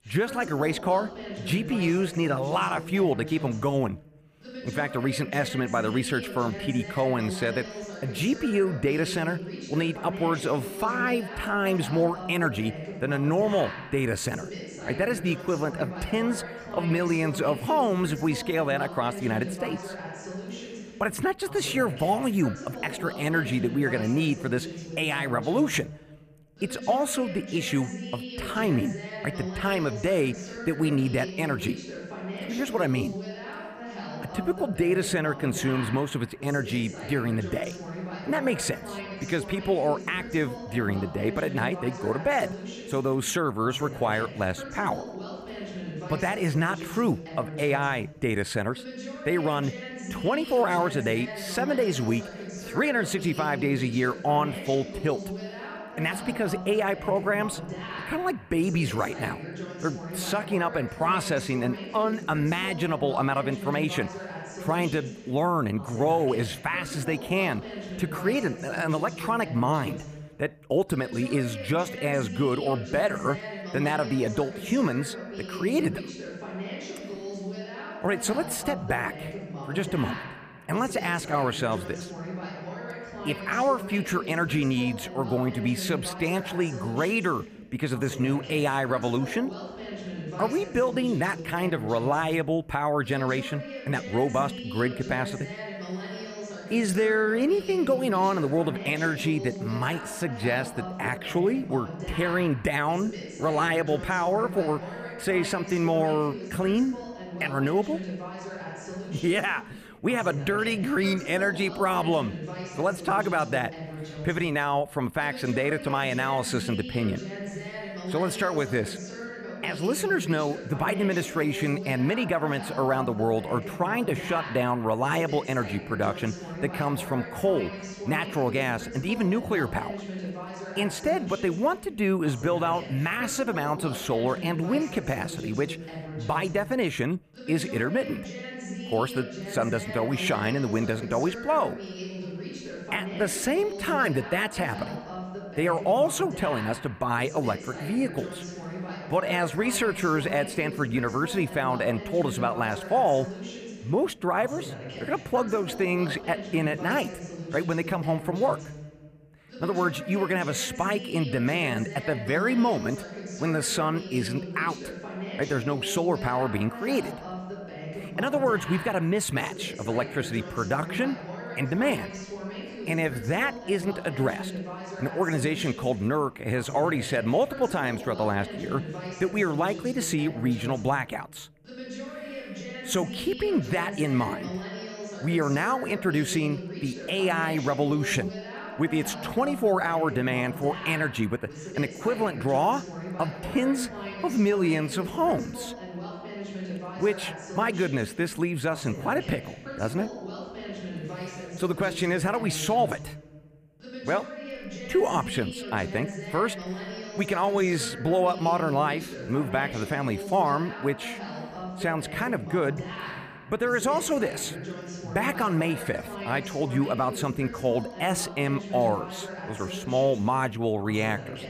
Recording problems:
voice in the background; noticeable; throughout; 10 dB below the speech

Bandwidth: 15 kHz